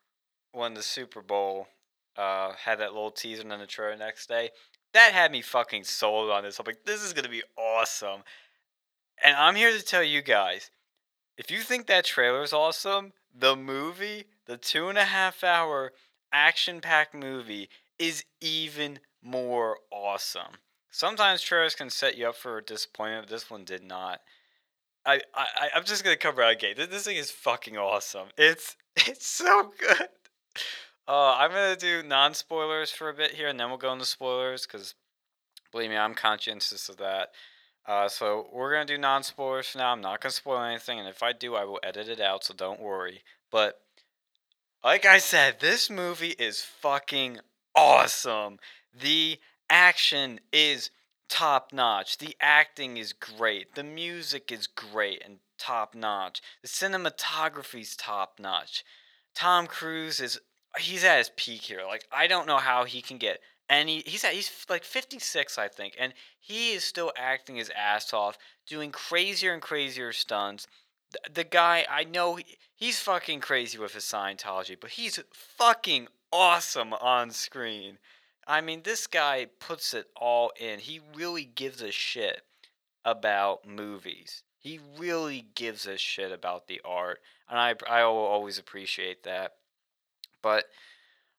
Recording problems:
thin; very; fading below 650 Hz

